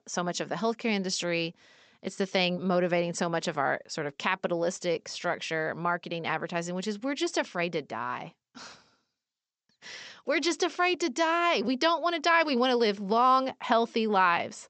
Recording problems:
high frequencies cut off; noticeable; nothing above 8 kHz

